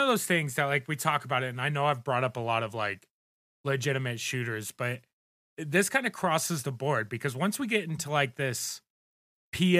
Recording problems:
abrupt cut into speech; at the start and the end

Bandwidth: 14.5 kHz